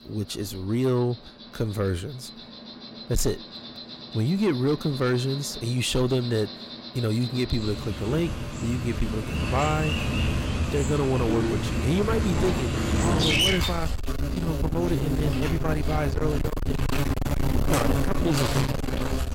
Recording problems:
distortion; heavy; 8 dB below the speech
animal sounds; loud; throughout; 1 dB below the speech

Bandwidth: 16 kHz